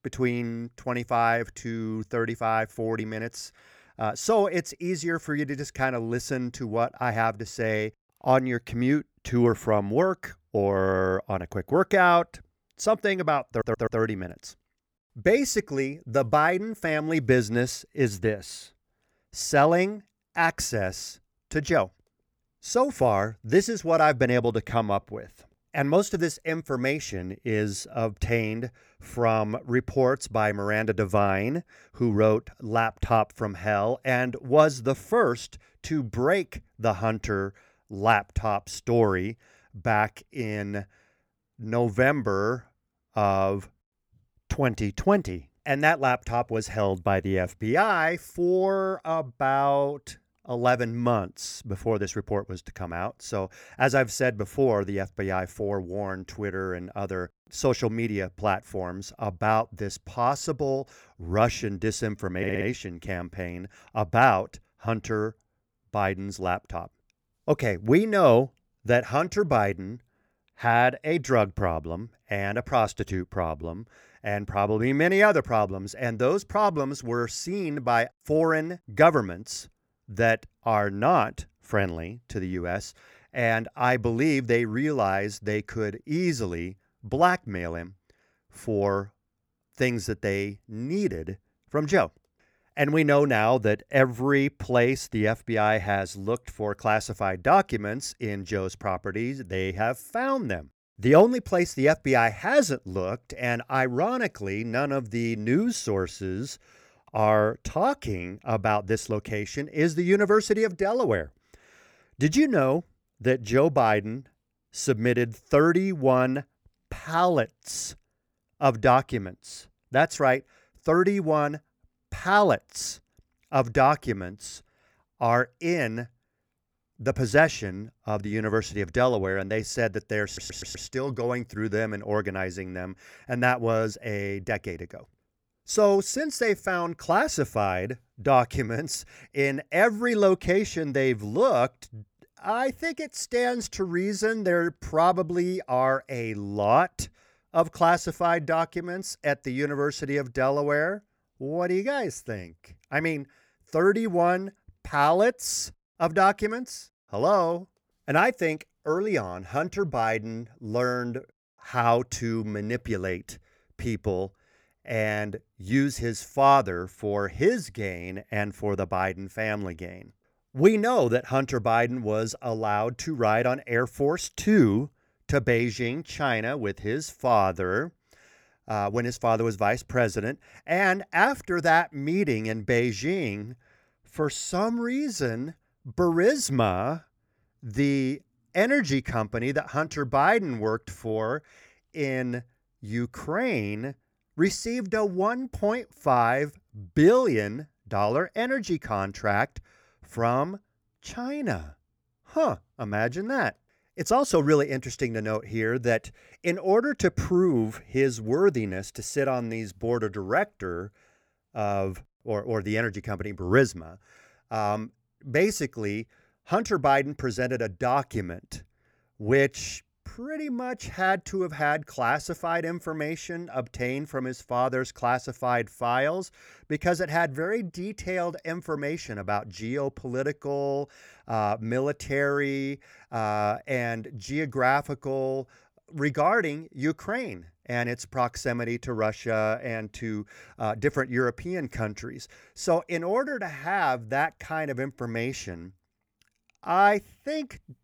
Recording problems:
audio stuttering; at 13 s, at 1:02 and at 2:10

